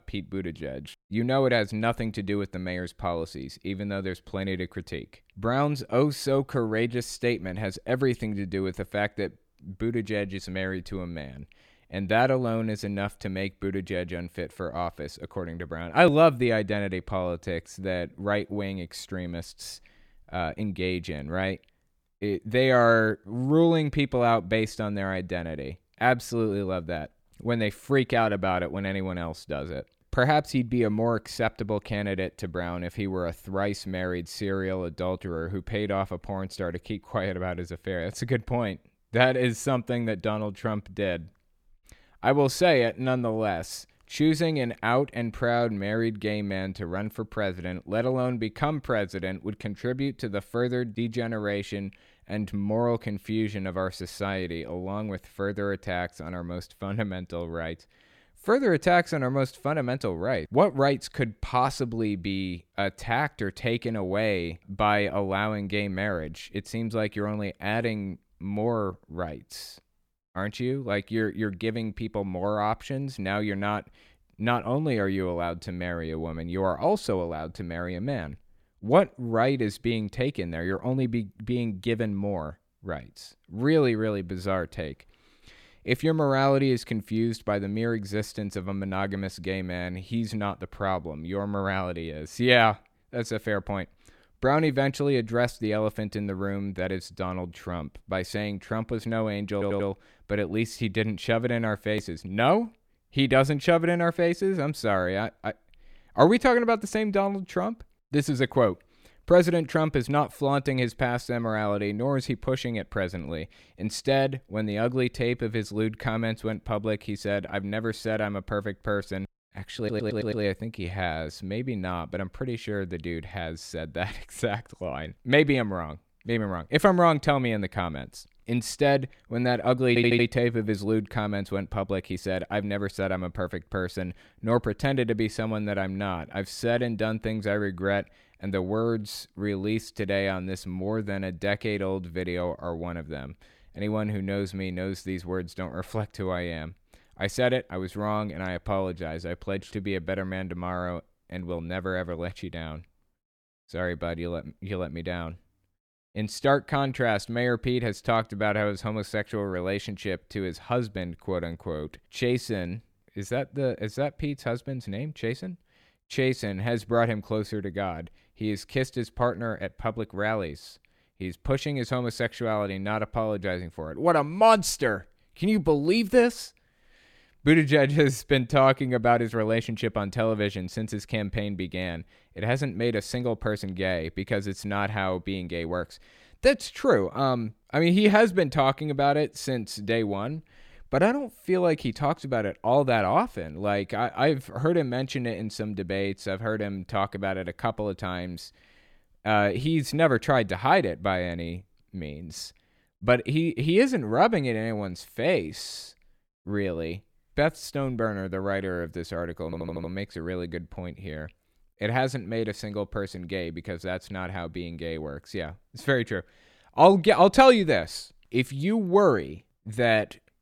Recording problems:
audio stuttering; 4 times, first at 1:40

